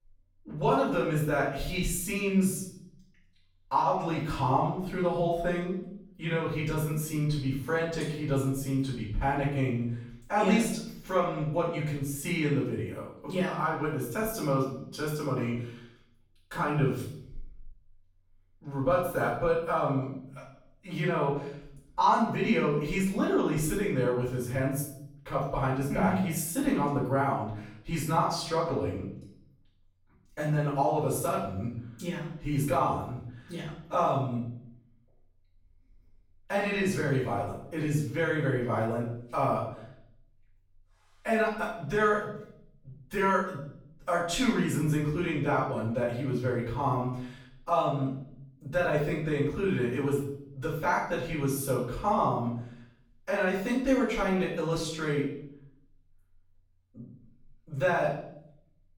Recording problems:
off-mic speech; far
room echo; noticeable; dies away in 0.6 s

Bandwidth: 18 kHz